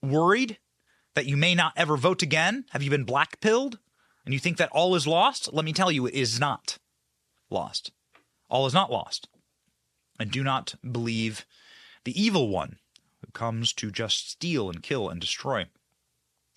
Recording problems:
none

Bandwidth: 13.5 kHz